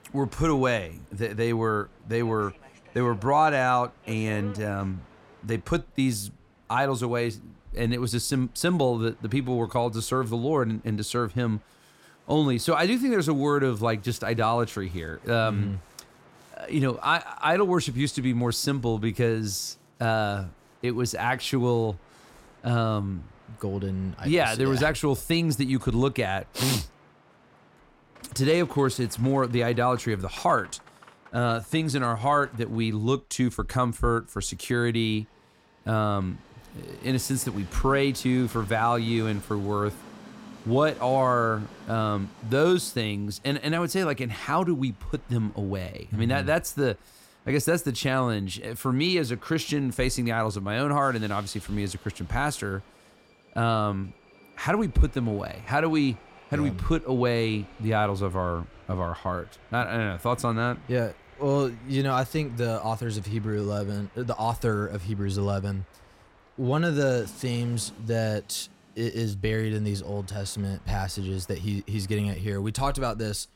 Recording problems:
train or aircraft noise; faint; throughout; 25 dB below the speech

